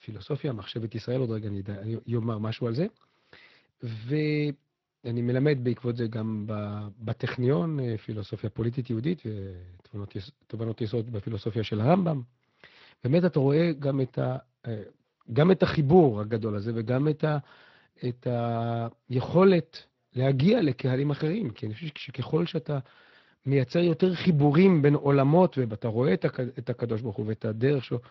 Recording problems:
garbled, watery; slightly

